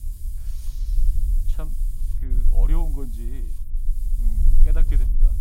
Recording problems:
hiss; loud; throughout; 8 dB below the speech
low rumble; loud; throughout; 6 dB below the speech

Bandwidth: 16 kHz